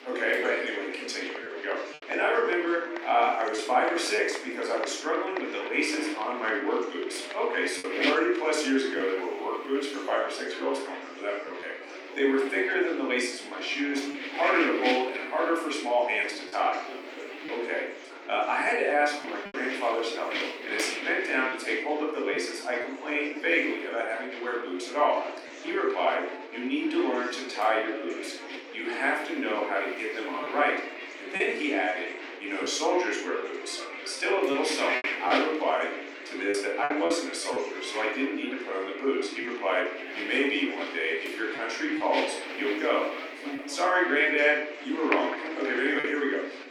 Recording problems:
room echo; noticeable; dies away in 0.6 s
thin; somewhat; fading below 250 Hz
off-mic speech; somewhat distant
wind noise on the microphone; heavy; 8 dB below the speech
murmuring crowd; noticeable; throughout; 10 dB below the speech
choppy; occasionally; 2% of the speech affected

